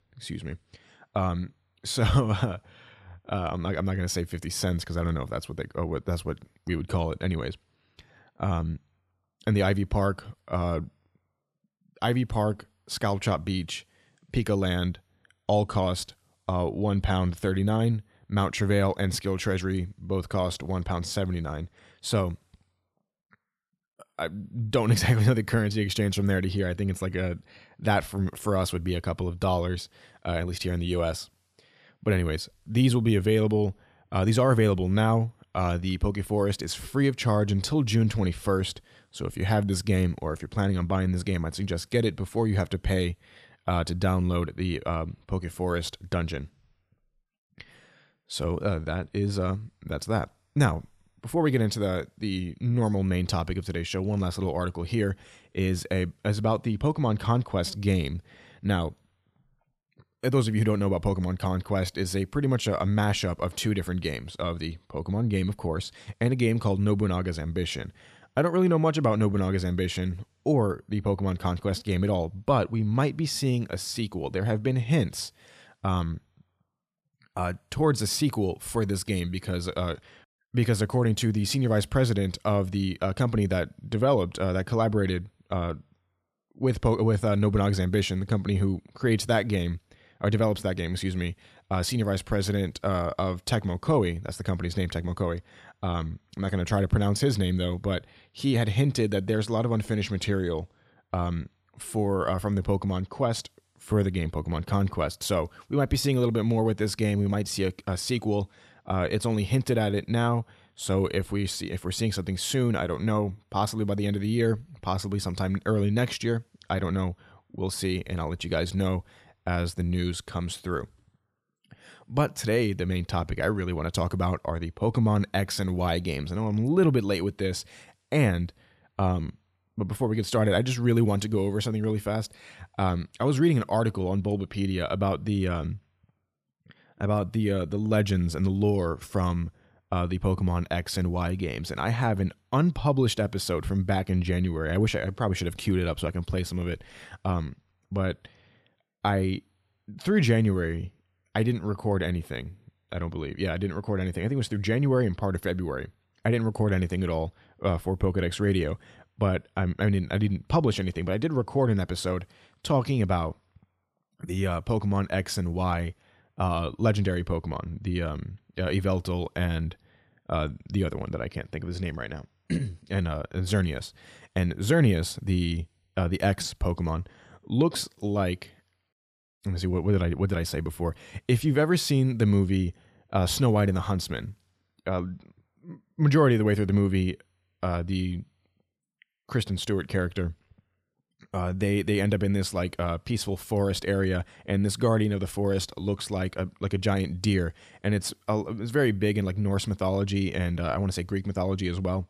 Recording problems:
none

